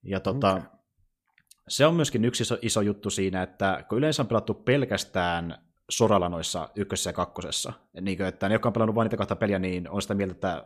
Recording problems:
none

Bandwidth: 14.5 kHz